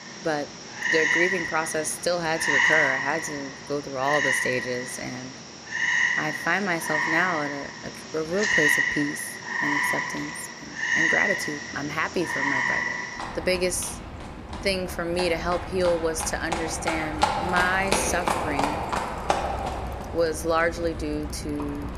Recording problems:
animal sounds; very loud; throughout; 2 dB above the speech
traffic noise; faint; throughout; 30 dB below the speech

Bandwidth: 14.5 kHz